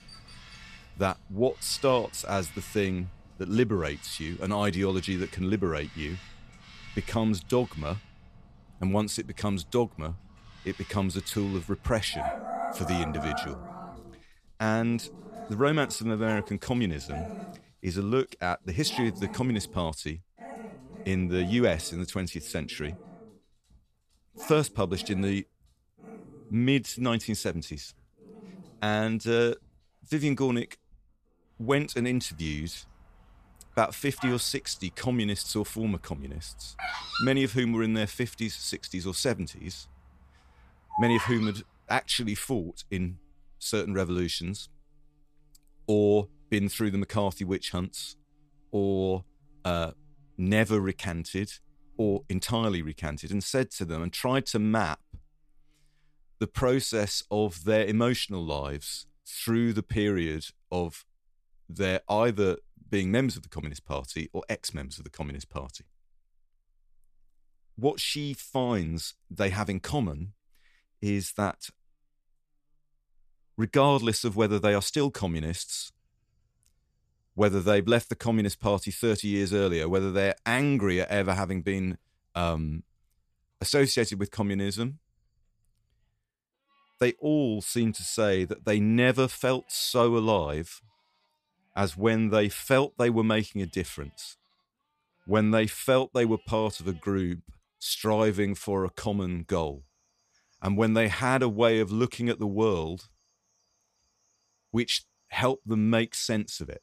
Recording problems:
animal sounds; noticeable; throughout; 15 dB below the speech

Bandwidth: 14.5 kHz